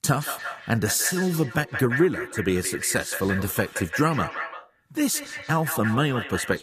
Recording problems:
echo of what is said; strong; throughout; 170 ms later, 8 dB below the speech

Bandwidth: 14.5 kHz